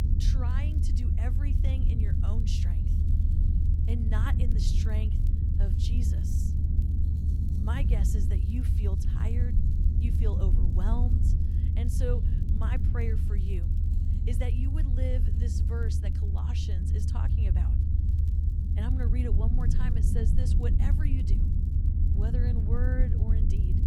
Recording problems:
low rumble; loud; throughout; as loud as the speech
household noises; faint; throughout; 30 dB below the speech
crackle, like an old record; faint; 25 dB below the speech

